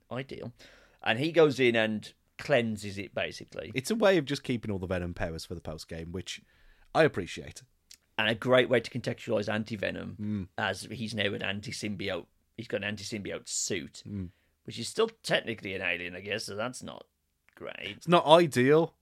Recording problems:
none

